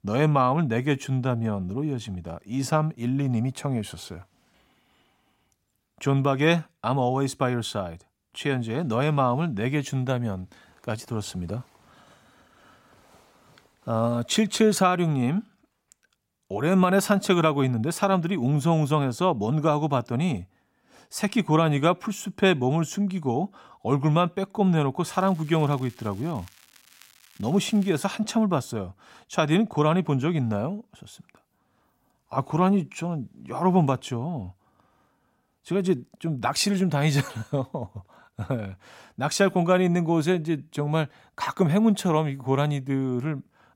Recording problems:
crackling; faint; from 25 to 28 s; 25 dB below the speech

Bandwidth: 16 kHz